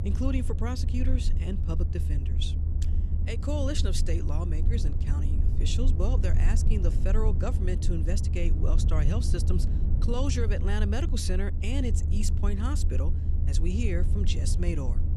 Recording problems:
low rumble; loud; throughout; 7 dB below the speech

